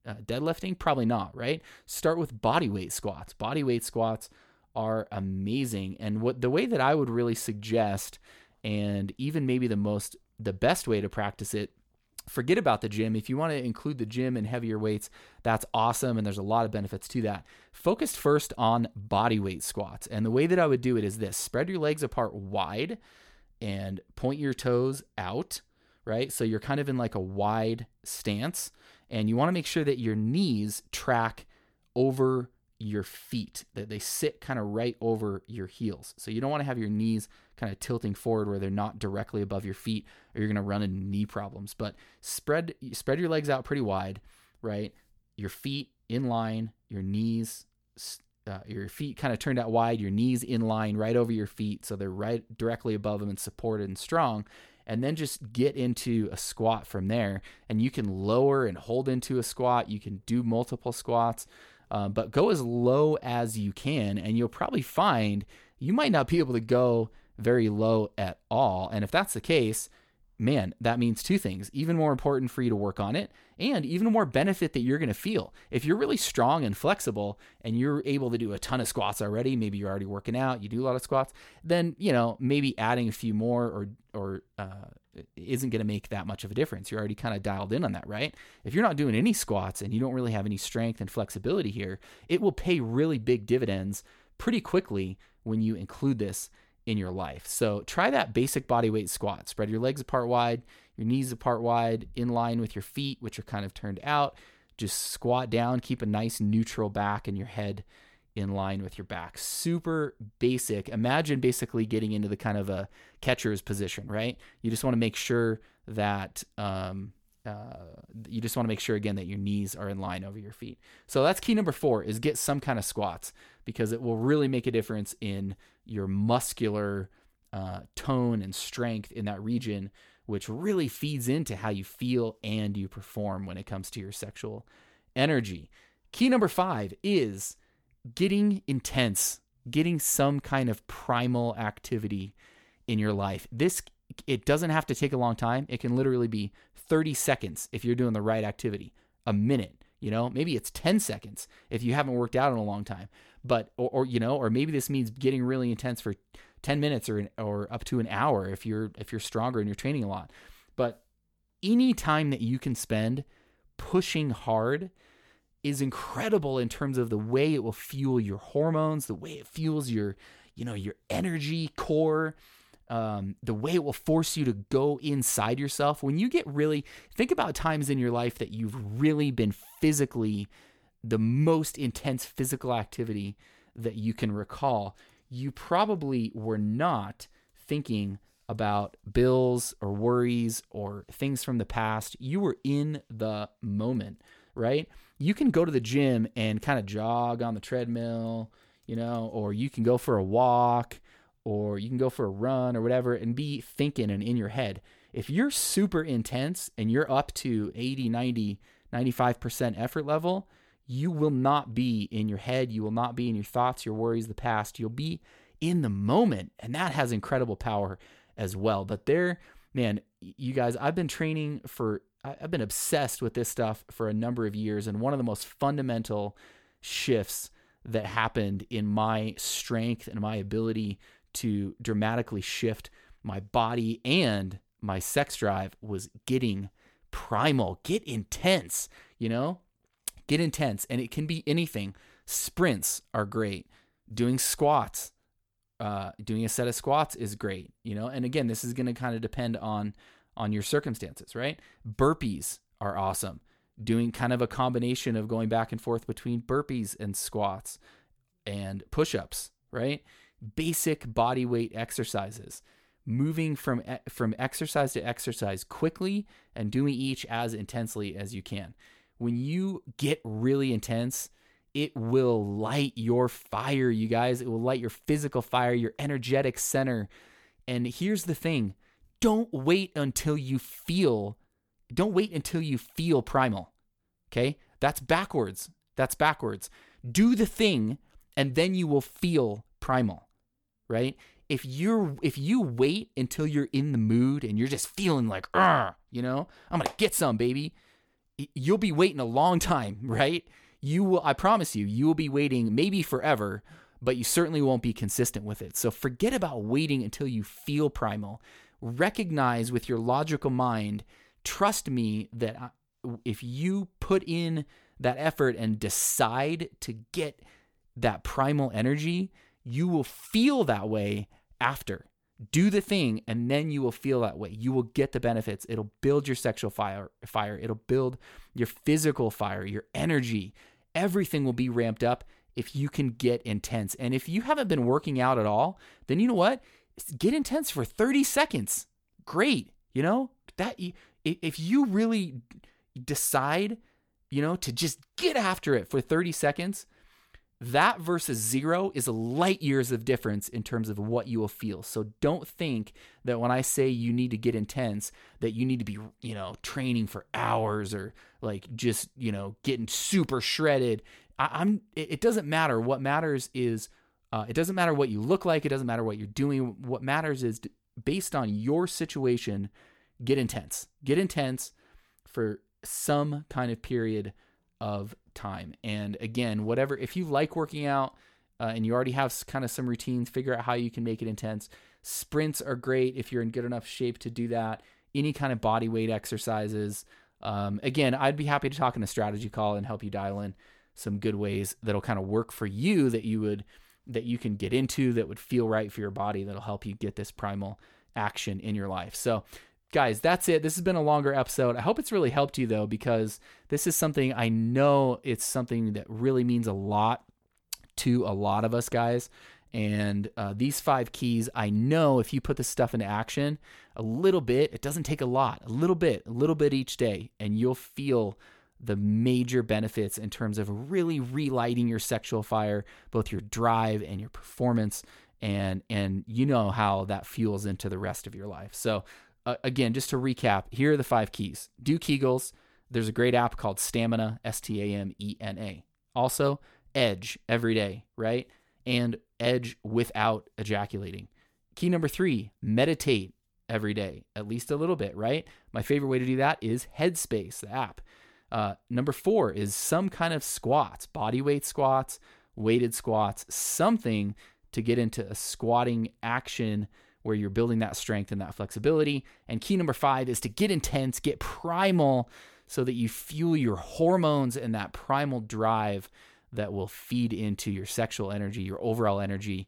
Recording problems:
none

